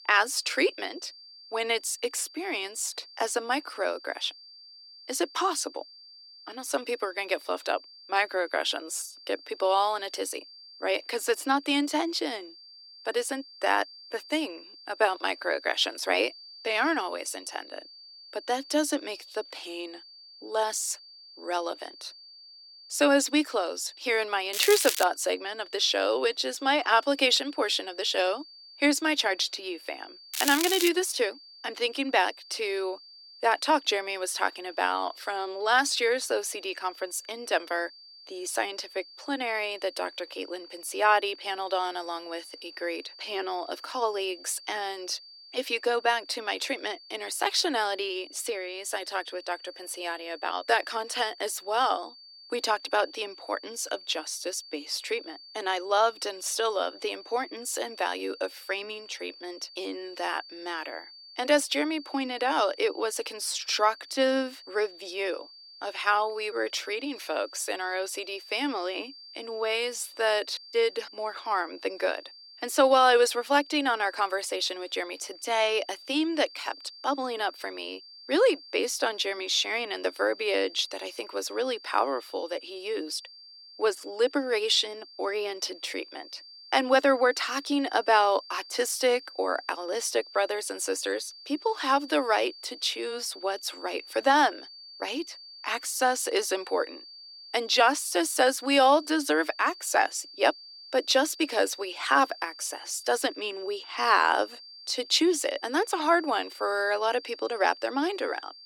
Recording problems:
thin; somewhat; fading below 300 Hz
crackling; loud; at 25 s and at 30 s; 2 dB below the speech
high-pitched whine; noticeable; throughout; 4.5 kHz, 20 dB below the speech

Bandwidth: 17 kHz